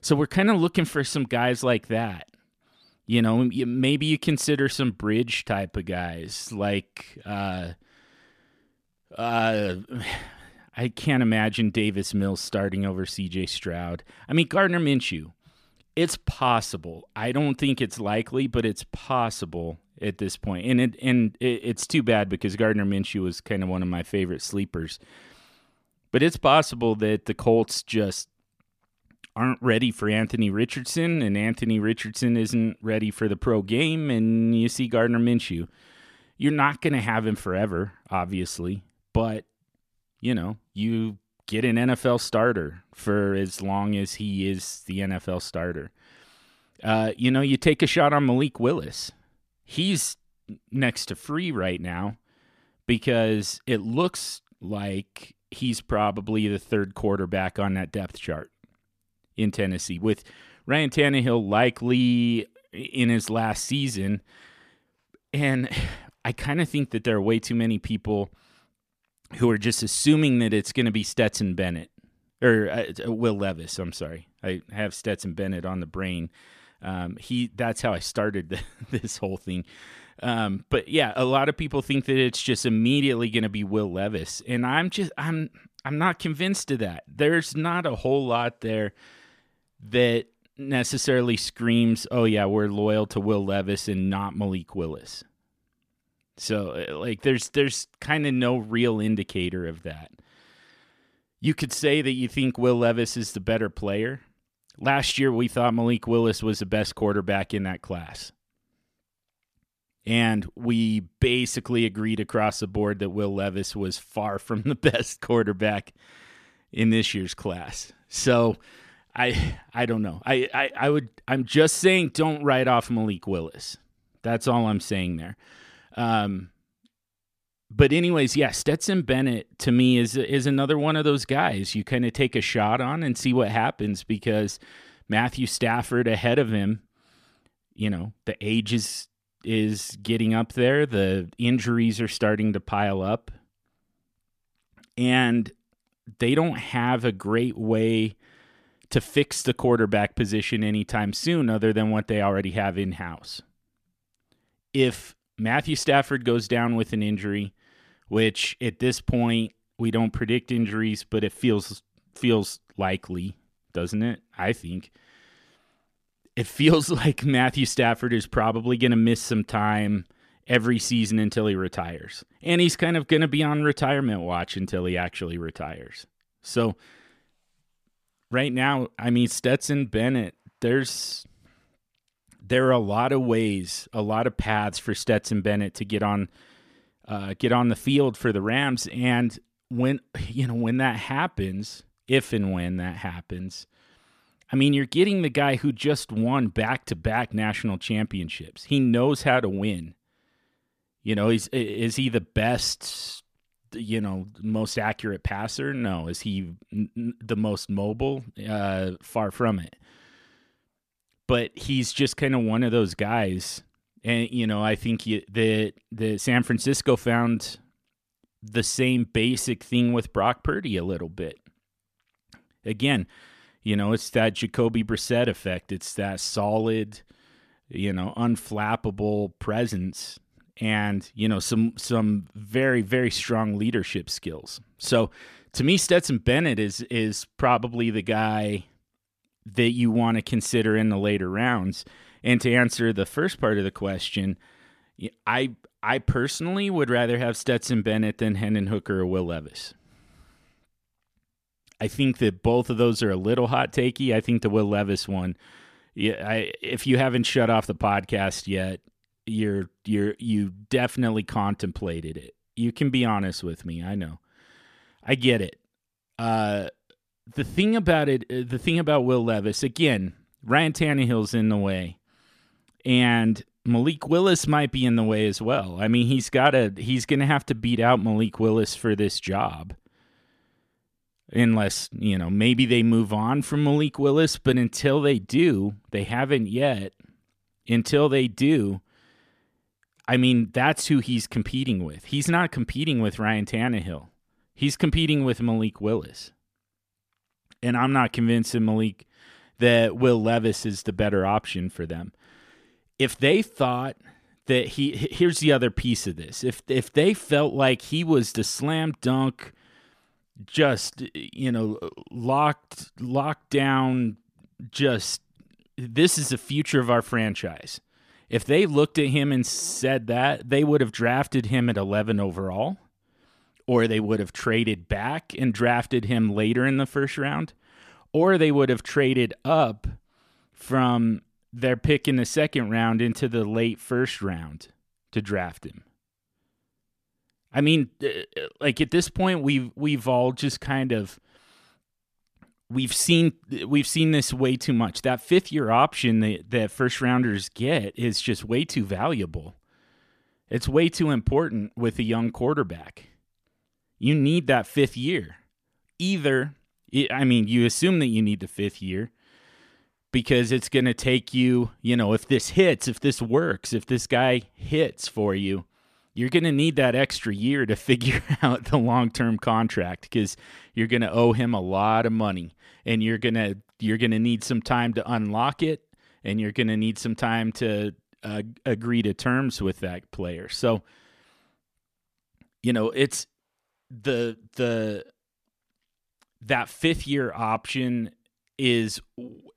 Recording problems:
none

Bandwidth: 14.5 kHz